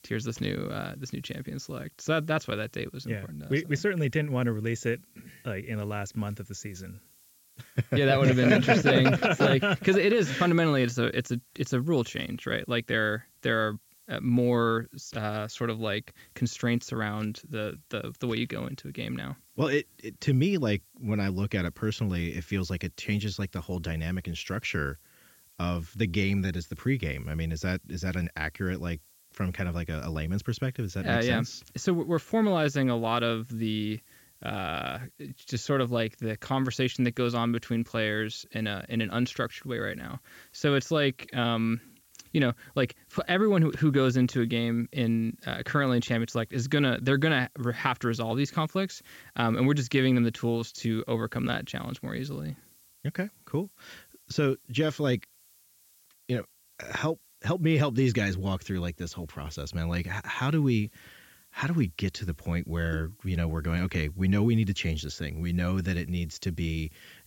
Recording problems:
high frequencies cut off; noticeable; nothing above 8 kHz
hiss; faint; throughout; 30 dB below the speech

